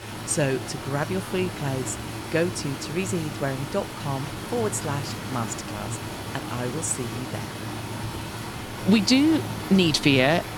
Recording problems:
rain or running water; loud; throughout; 8 dB below the speech
traffic noise; faint; throughout; 20 dB below the speech

